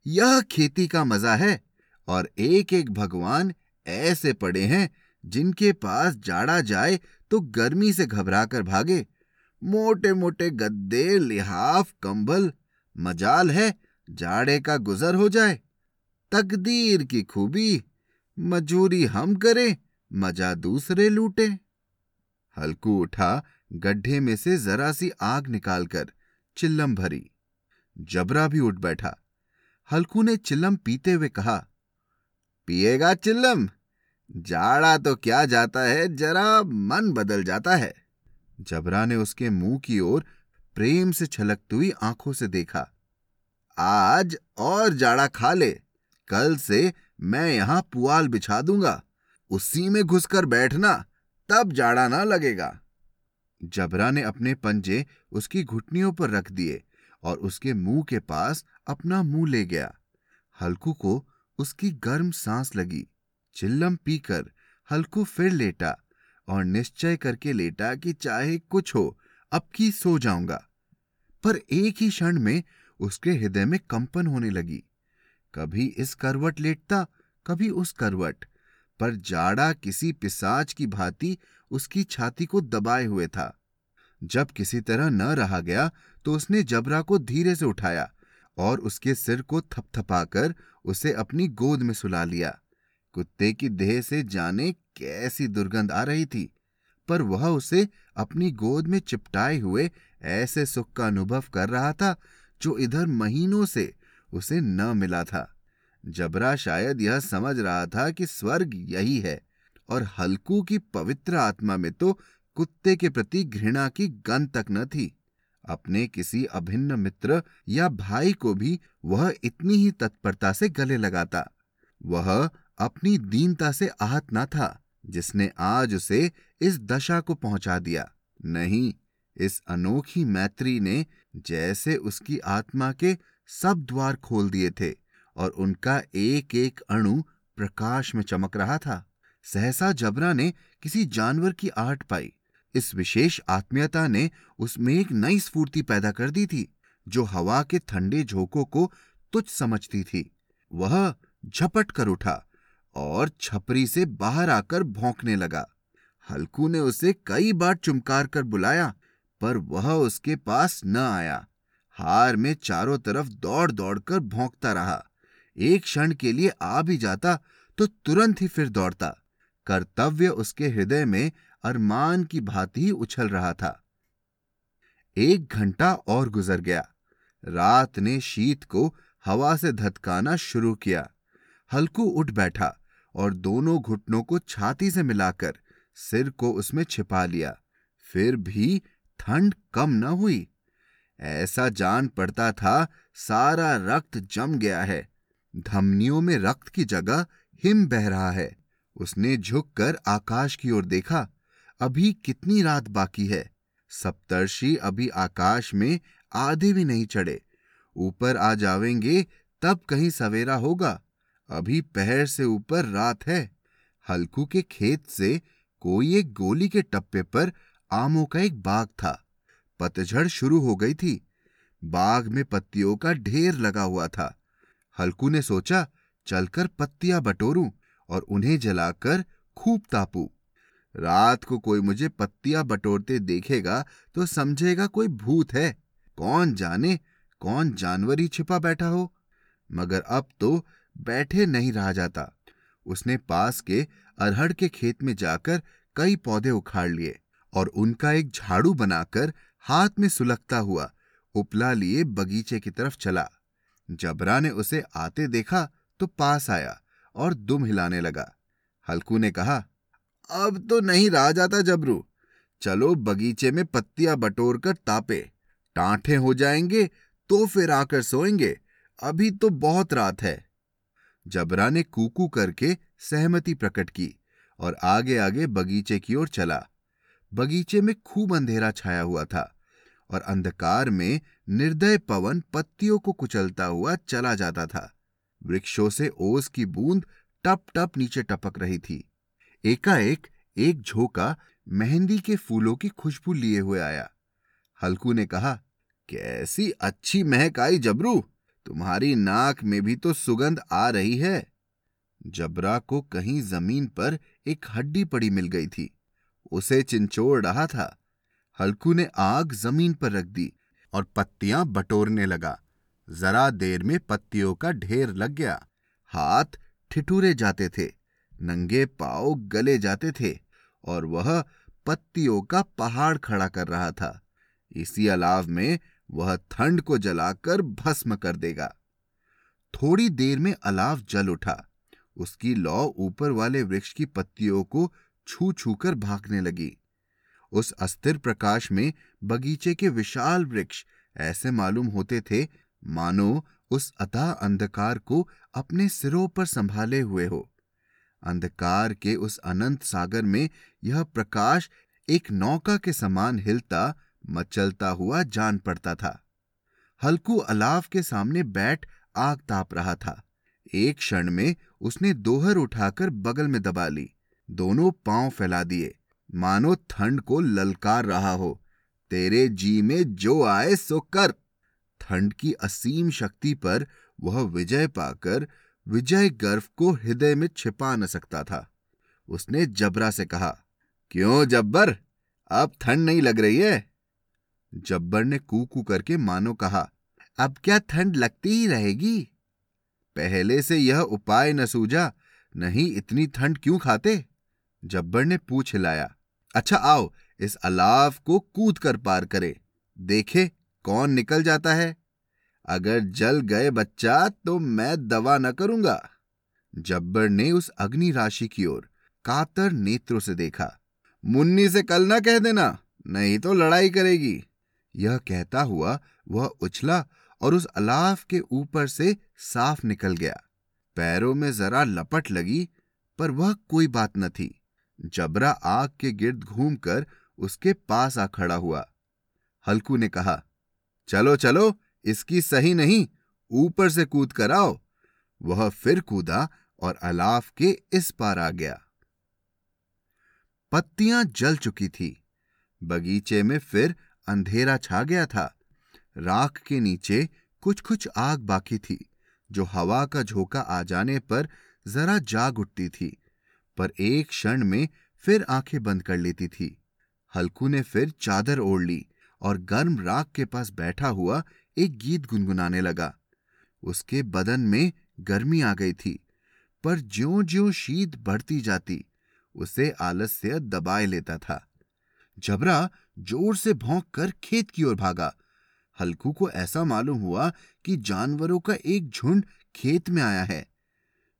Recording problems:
none

